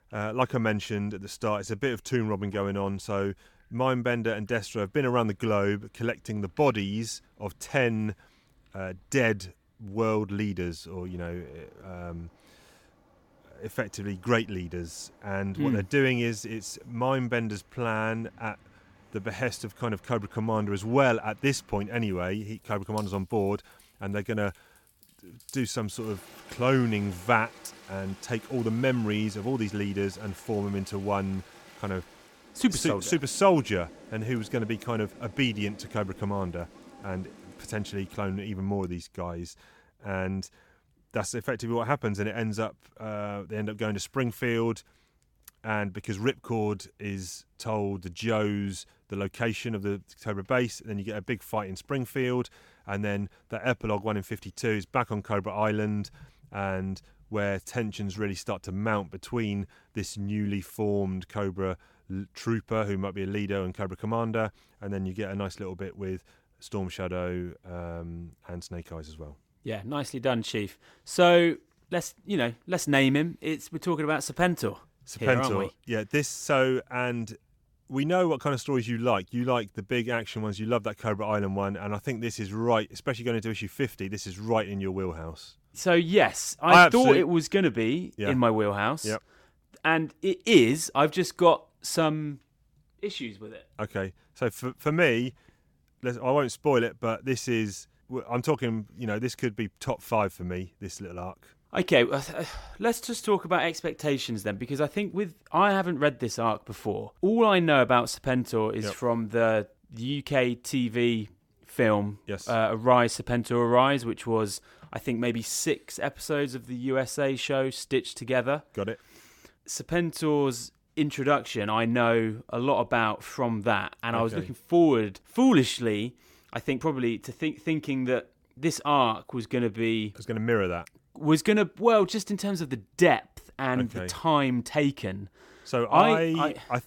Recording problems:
rain or running water; faint; until 38 s; 25 dB below the speech

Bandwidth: 17.5 kHz